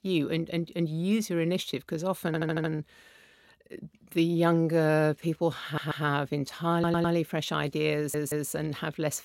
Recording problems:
audio stuttering; 4 times, first at 2.5 s

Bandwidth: 16 kHz